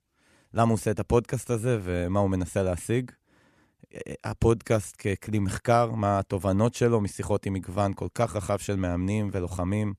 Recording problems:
none

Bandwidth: 13.5 kHz